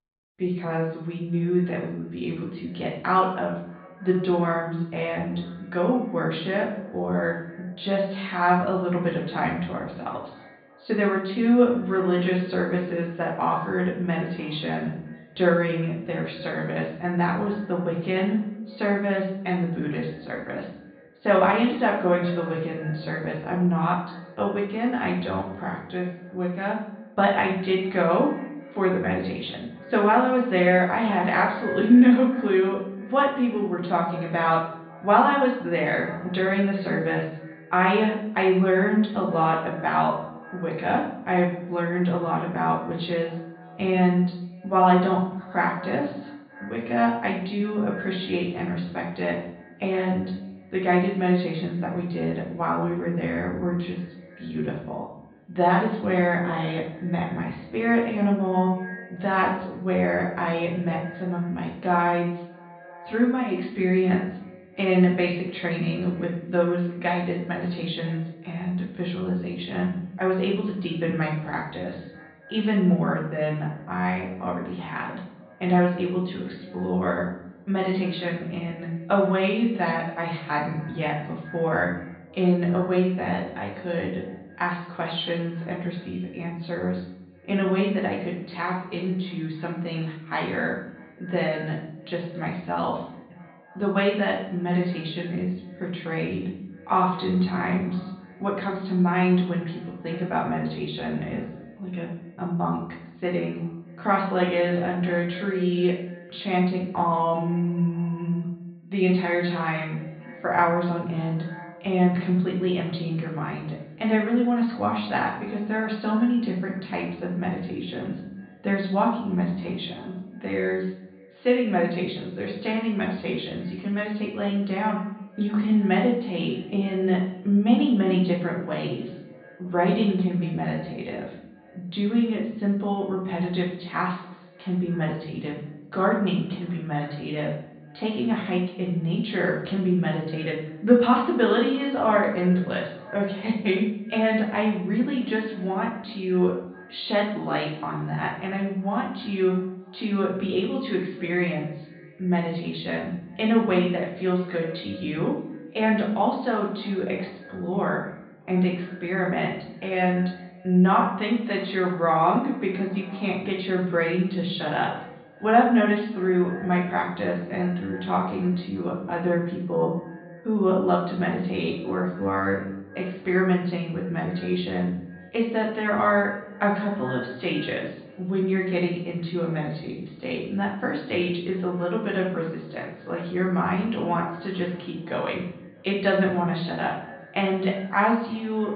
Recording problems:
off-mic speech; far
high frequencies cut off; severe; nothing above 4.5 kHz
room echo; noticeable; dies away in 0.6 s
echo of what is said; faint; throughout; 310 ms later, 20 dB below the speech

